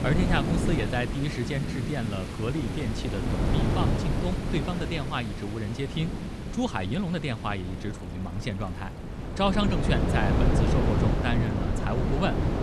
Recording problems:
wind noise on the microphone; heavy; 3 dB below the speech
rain or running water; loud; throughout; 7 dB below the speech

